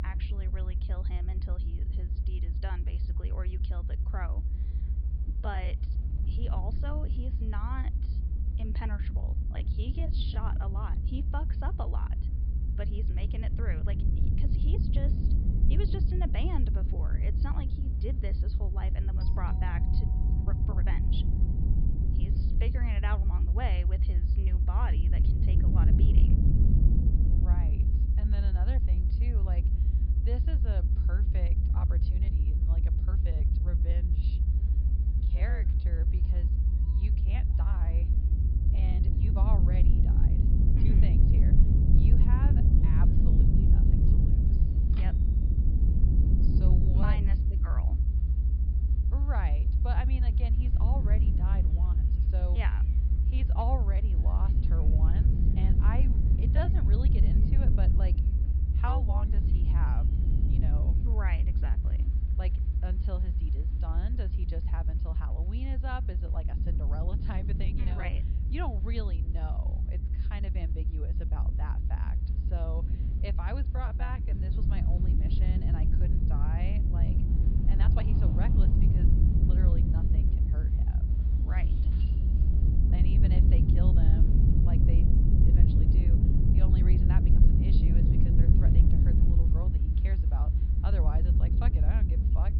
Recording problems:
high frequencies cut off; noticeable; nothing above 5 kHz
low rumble; very loud; throughout; as loud as the speech
wind noise on the microphone; occasional gusts; 25 dB below the speech
crowd noise; faint; throughout; 25 dB below the speech
uneven, jittery; strongly; from 5 s to 1:18
doorbell; faint; from 19 to 22 s; peak 10 dB below the speech
keyboard typing; noticeable; at 45 s; peak 10 dB below the speech
jangling keys; faint; from 1:21 to 1:23; peak 10 dB below the speech

